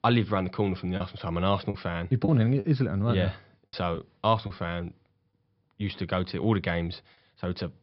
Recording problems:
high frequencies cut off; noticeable; nothing above 5.5 kHz
choppy; occasionally; 3% of the speech affected

